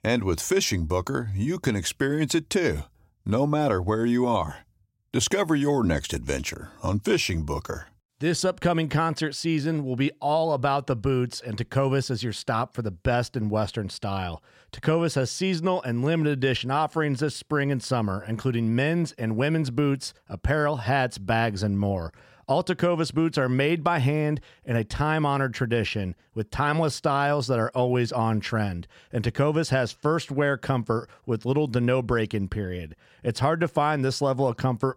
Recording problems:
none

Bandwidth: 16 kHz